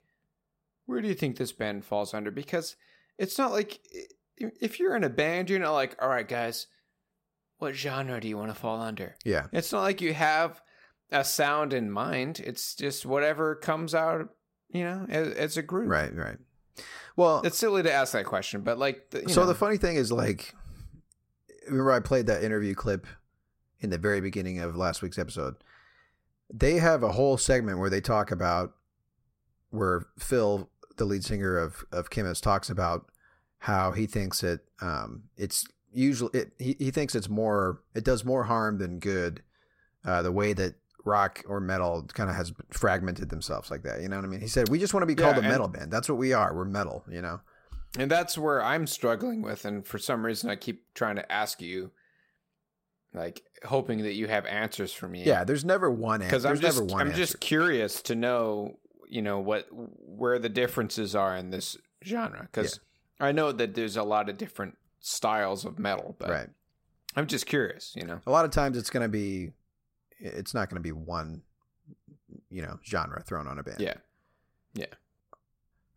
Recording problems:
none

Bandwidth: 16 kHz